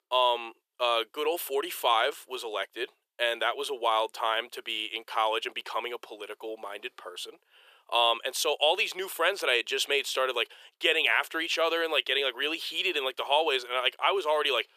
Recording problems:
thin; very; fading below 400 Hz

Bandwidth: 14.5 kHz